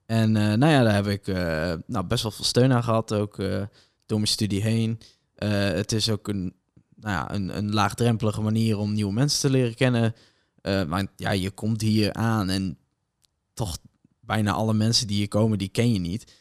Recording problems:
none

